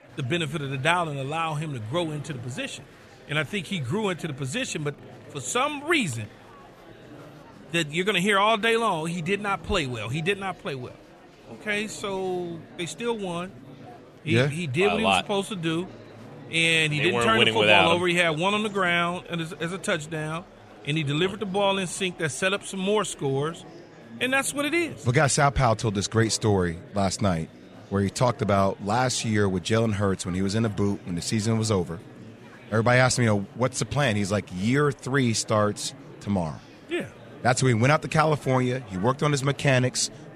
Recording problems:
chatter from many people; faint; throughout; 20 dB below the speech

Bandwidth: 14 kHz